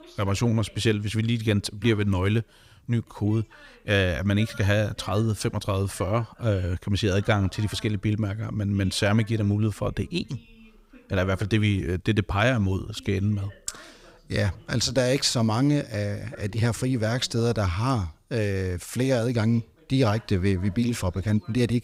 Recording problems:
voice in the background; faint; throughout; 25 dB below the speech

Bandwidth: 15.5 kHz